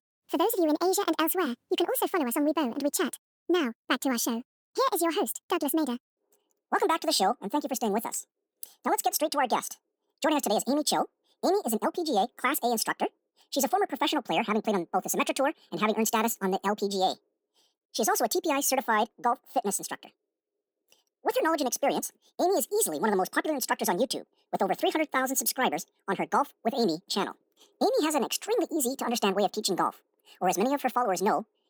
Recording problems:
wrong speed and pitch; too fast and too high; 1.7 times normal speed

